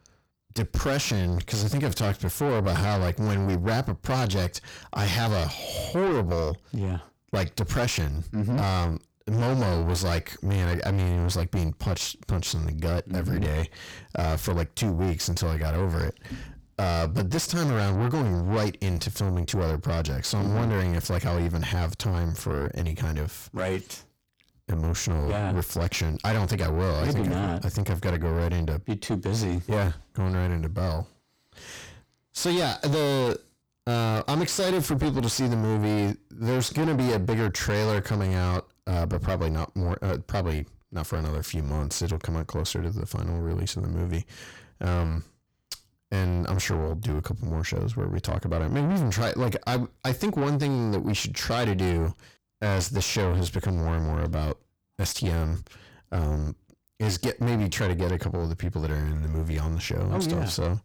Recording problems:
distortion; heavy; 7 dB below the speech

